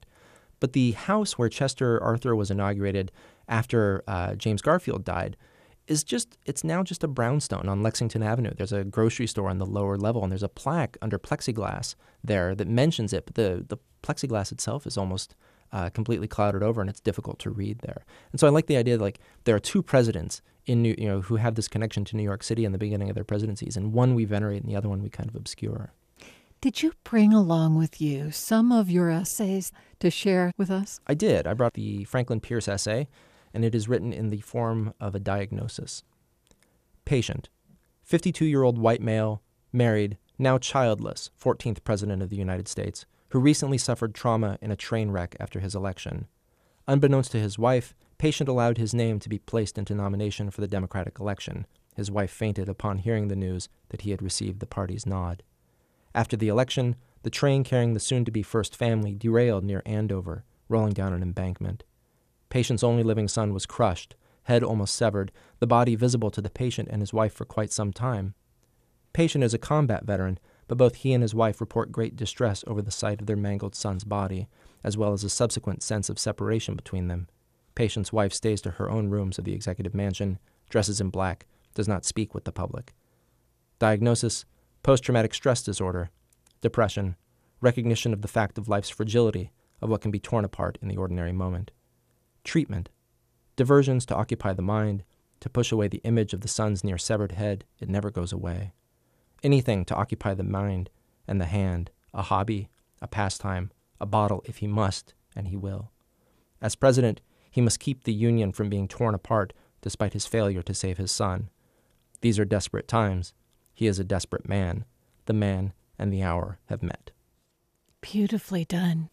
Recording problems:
none

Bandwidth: 14.5 kHz